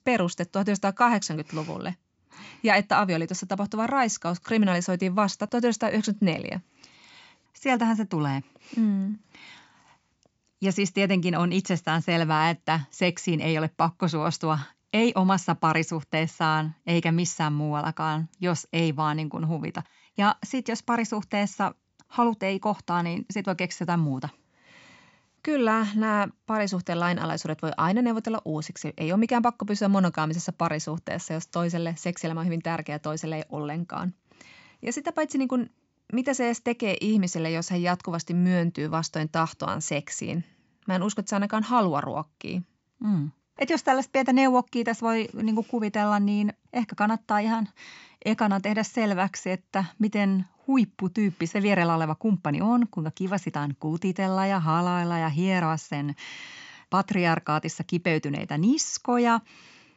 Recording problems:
high frequencies cut off; noticeable; nothing above 8 kHz

